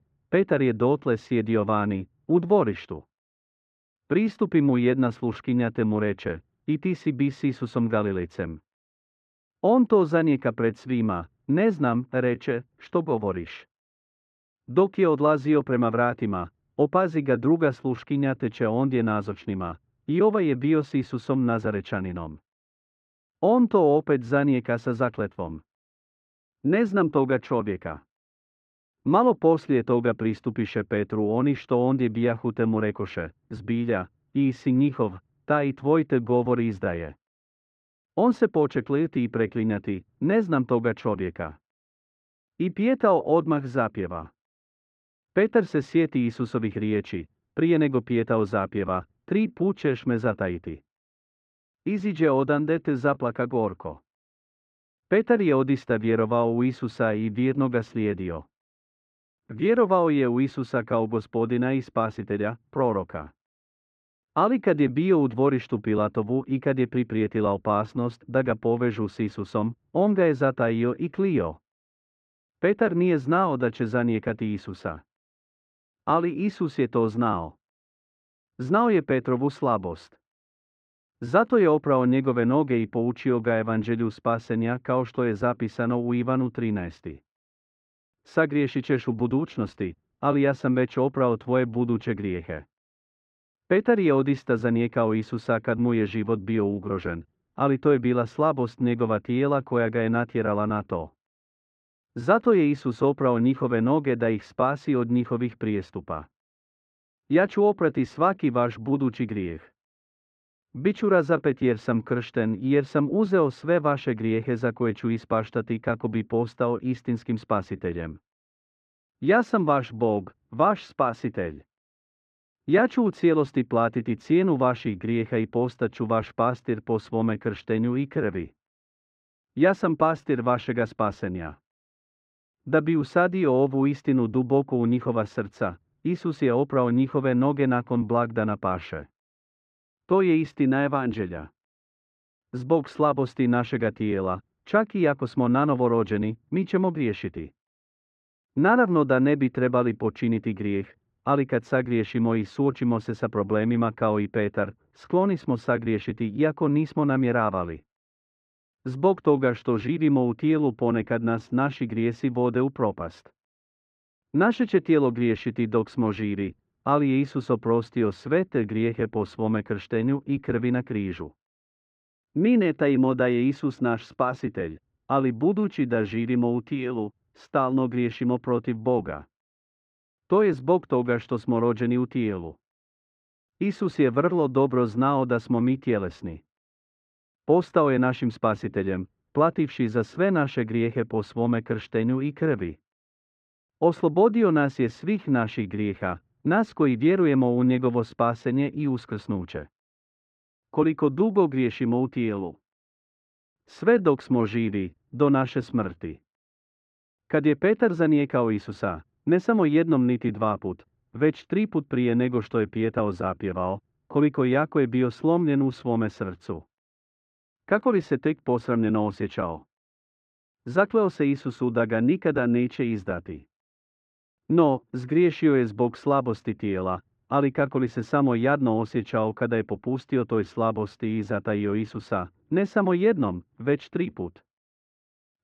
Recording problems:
muffled; very; fading above 1.5 kHz

